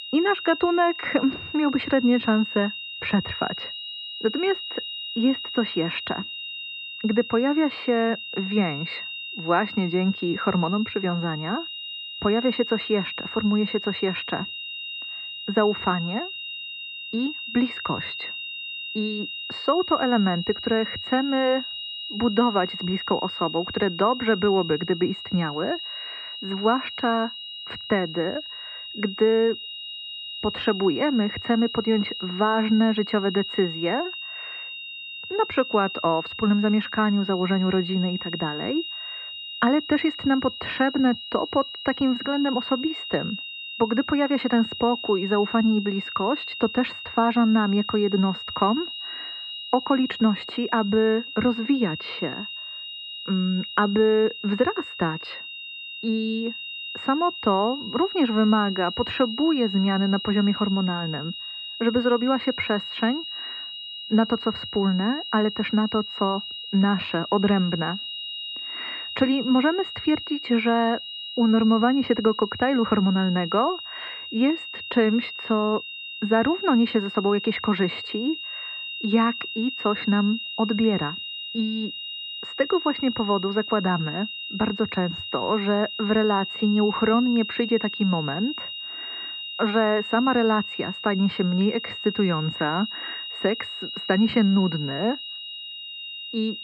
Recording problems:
muffled; very; fading above 2.5 kHz
high-pitched whine; loud; throughout; 3 kHz, 8 dB below the speech

